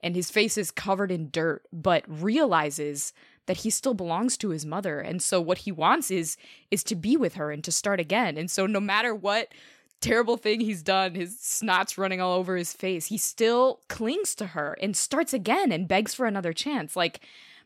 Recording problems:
none

